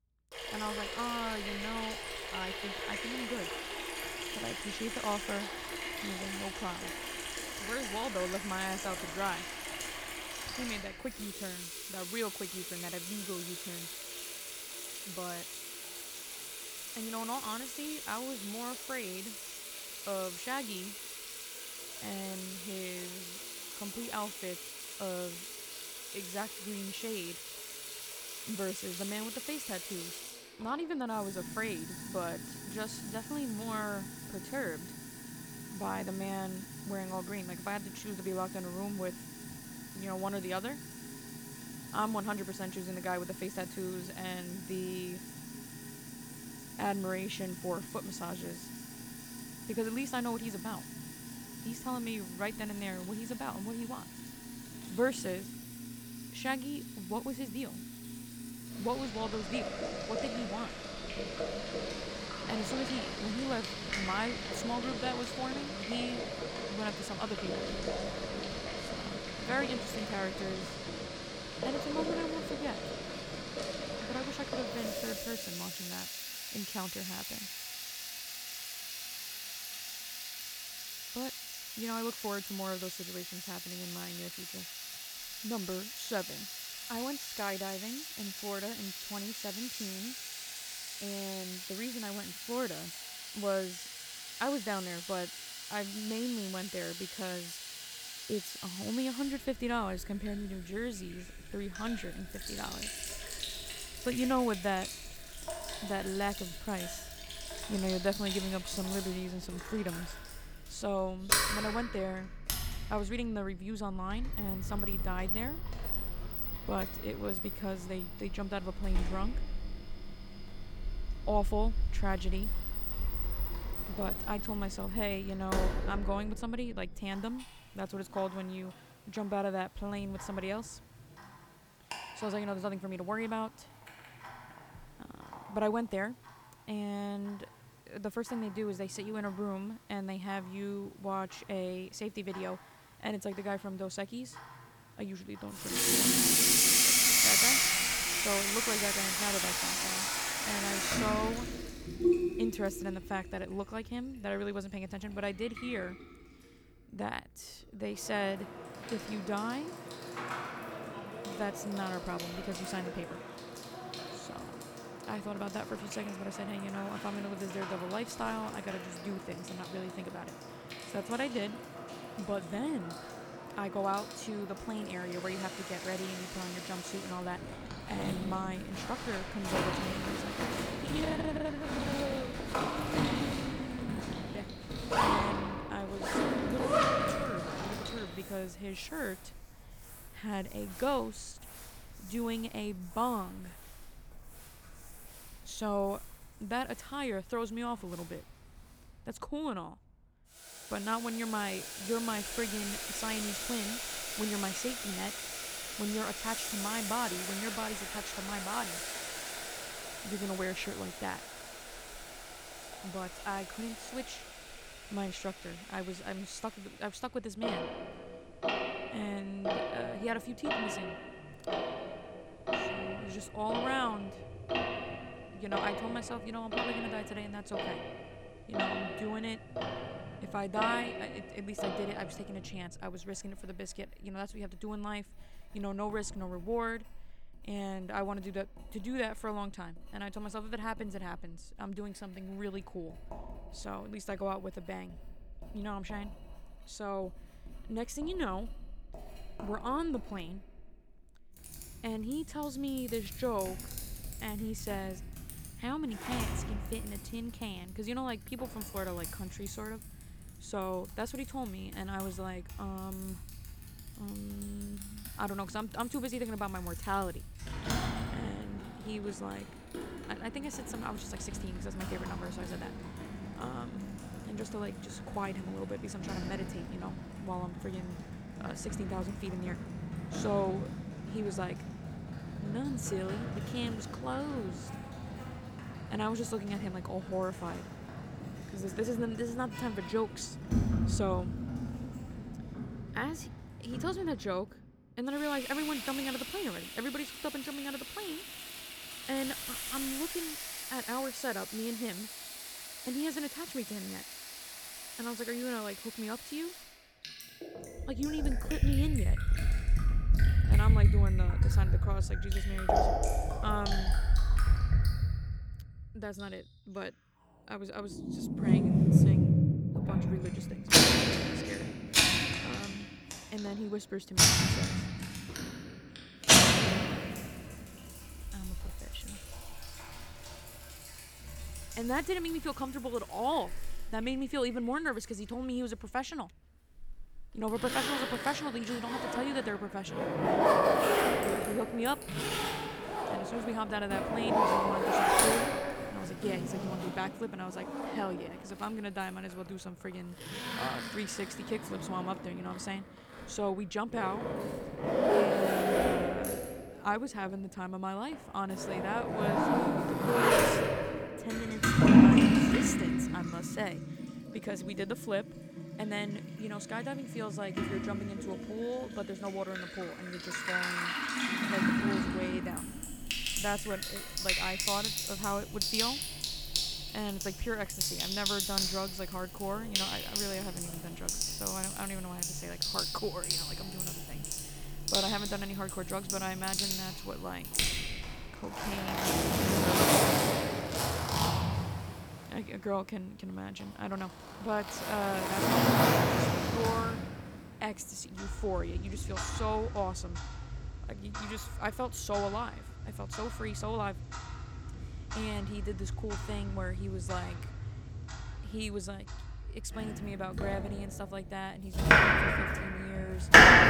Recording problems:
household noises; very loud; throughout; 5 dB above the speech

